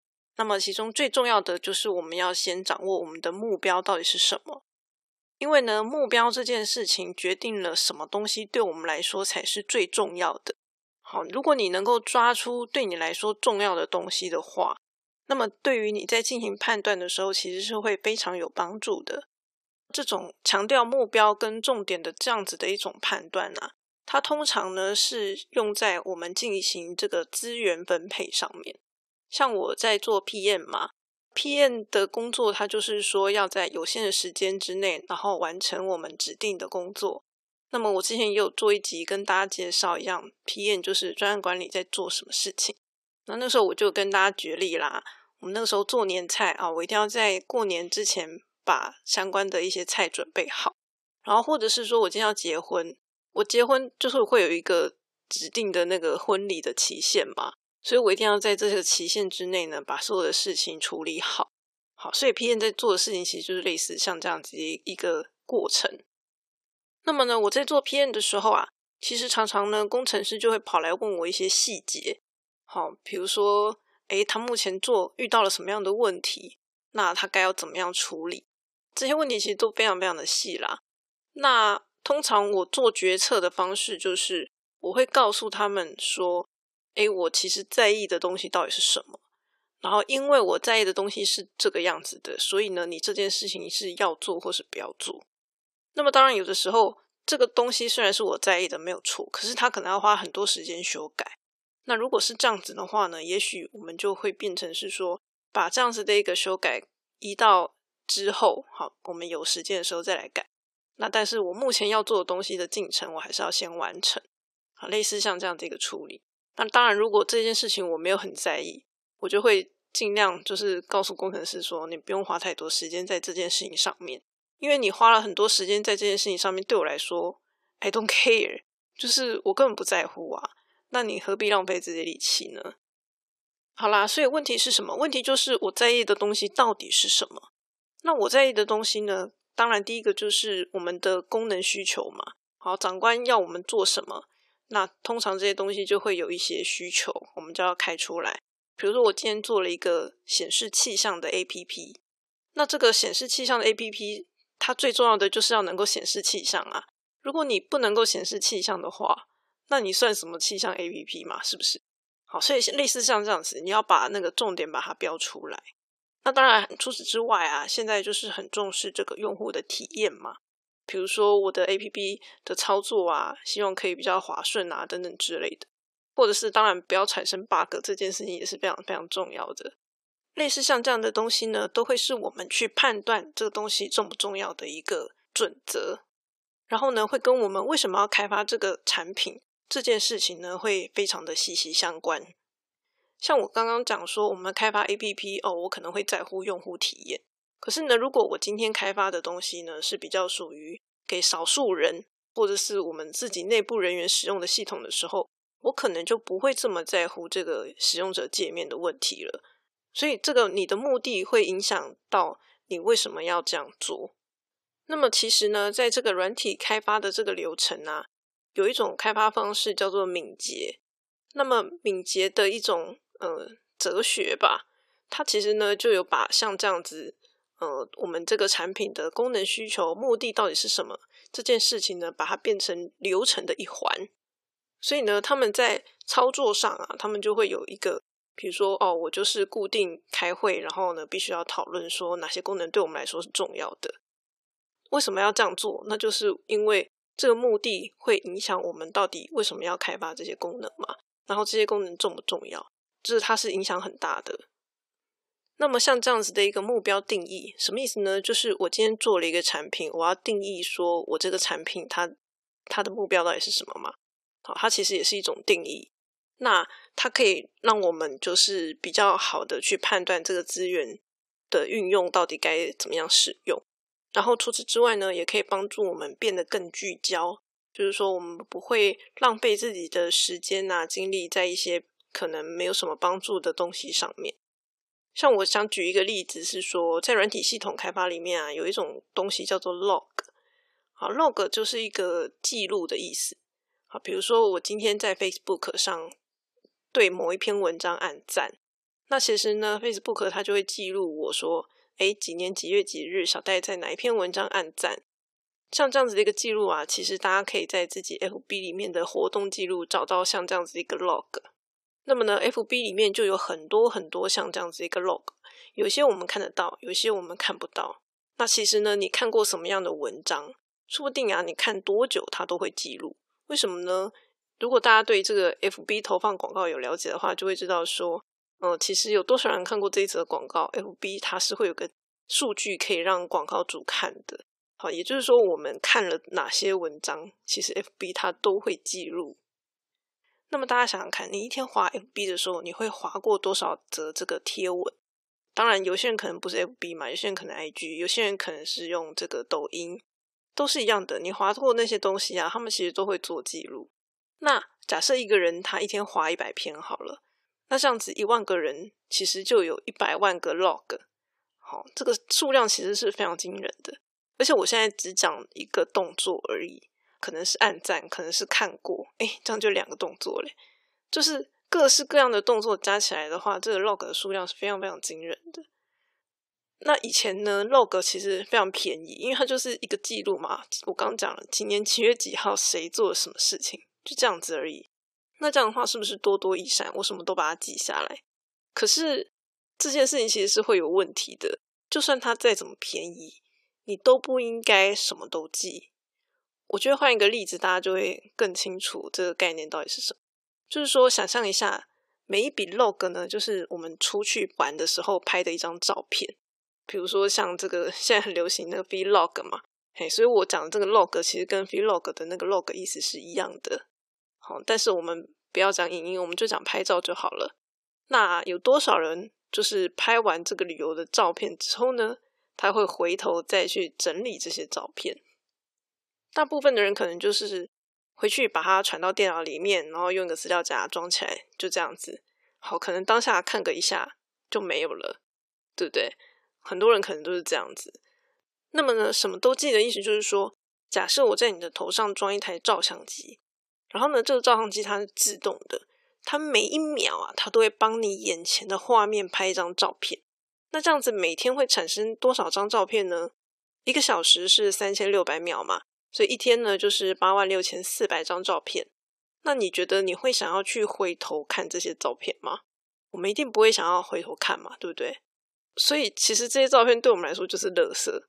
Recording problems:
thin; very; fading below 400 Hz

